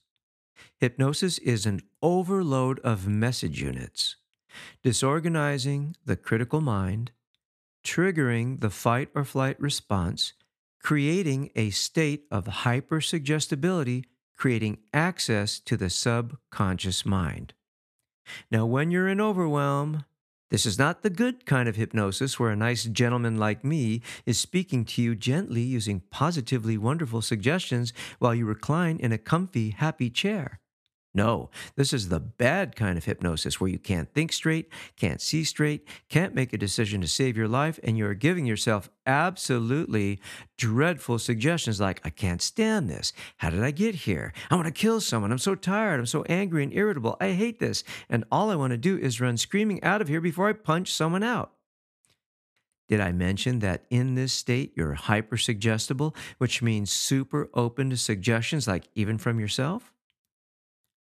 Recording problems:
none

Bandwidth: 14 kHz